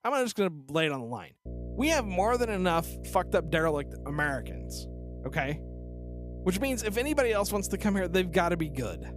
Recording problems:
electrical hum; noticeable; from 1.5 s on; 60 Hz, 20 dB below the speech

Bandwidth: 15 kHz